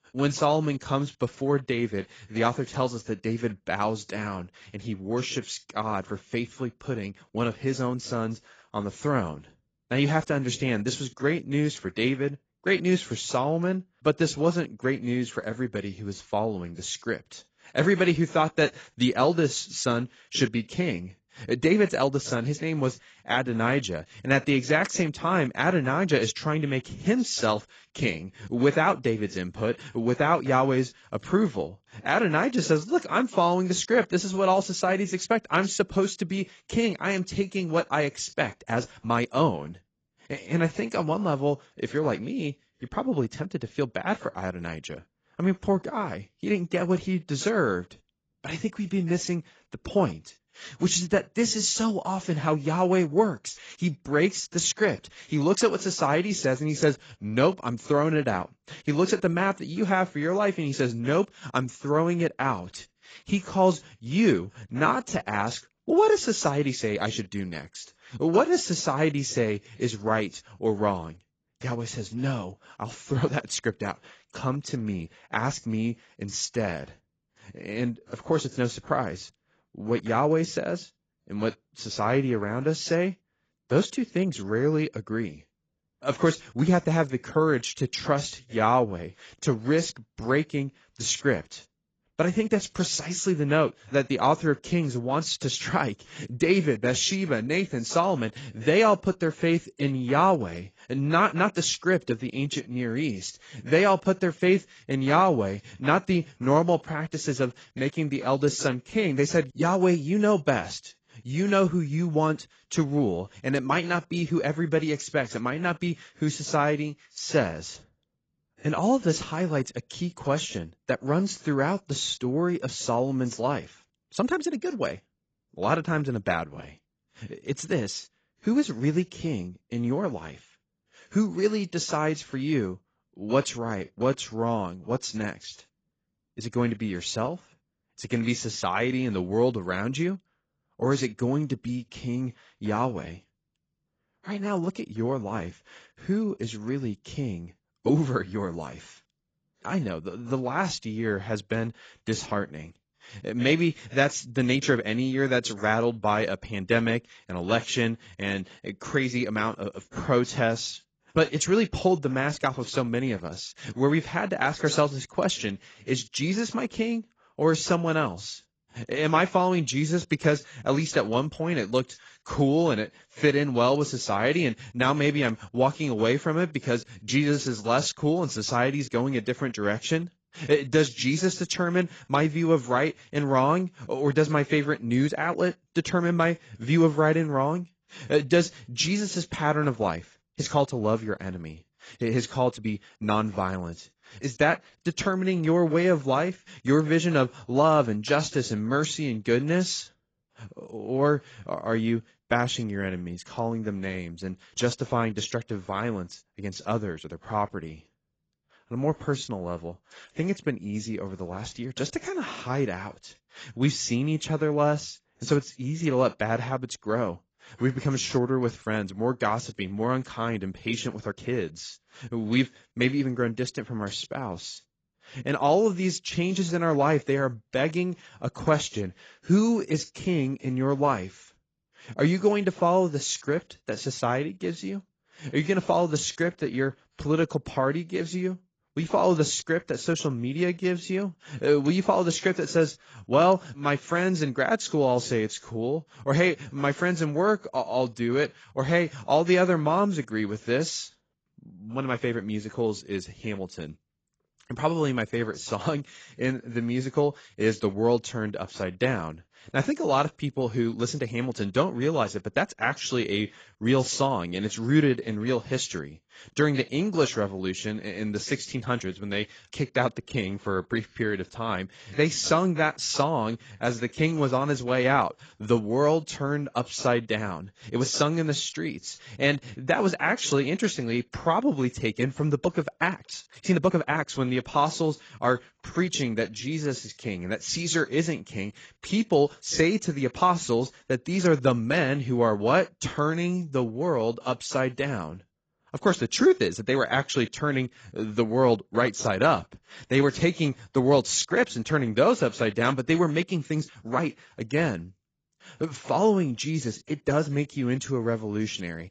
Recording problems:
garbled, watery; badly; nothing above 7.5 kHz
uneven, jittery; strongly; from 39 s to 5:04

